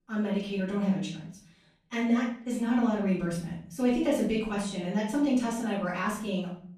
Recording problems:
off-mic speech; far
room echo; noticeable; dies away in 0.6 s

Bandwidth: 14.5 kHz